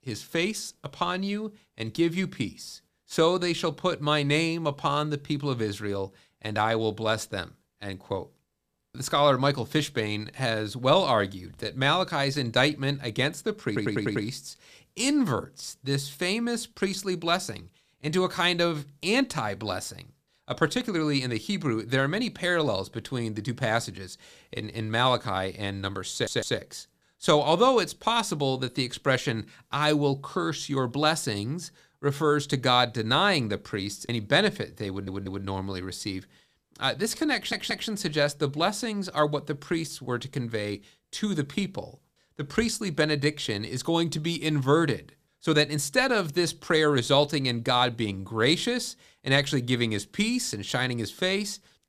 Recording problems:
audio stuttering; 4 times, first at 14 s

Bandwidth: 14.5 kHz